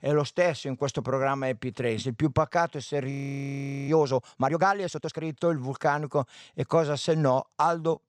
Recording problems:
audio freezing; at 3 s for 1 s

